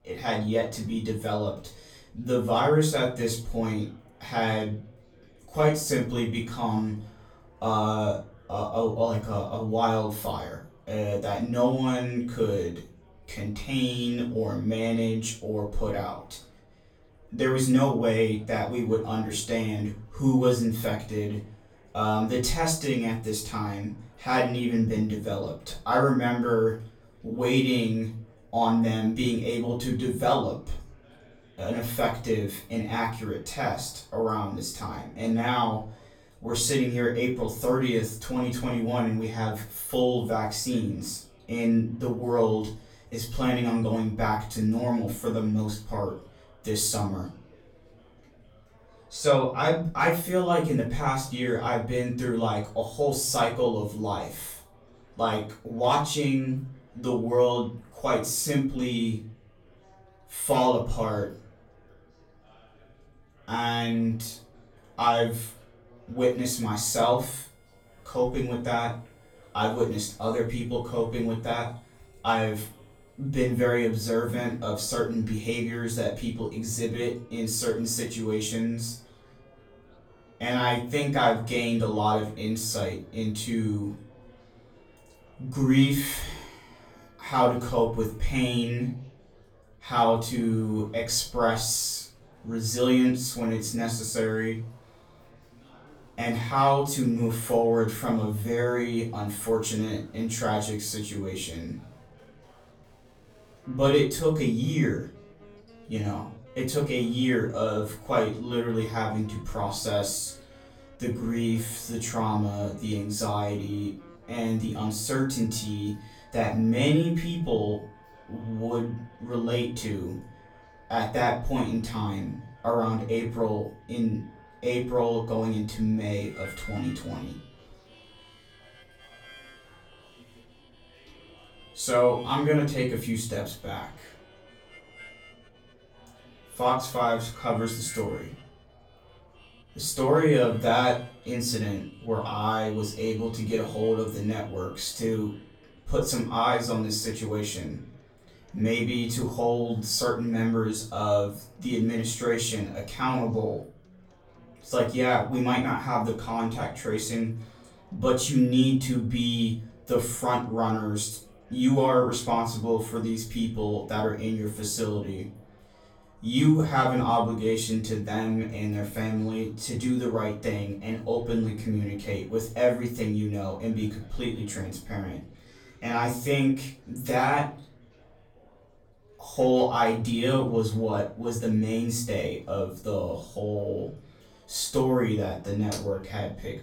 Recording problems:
off-mic speech; far
room echo; slight; dies away in 0.3 s
background music; faint; throughout; 30 dB below the speech
chatter from many people; faint; throughout; 30 dB below the speech

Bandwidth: 19 kHz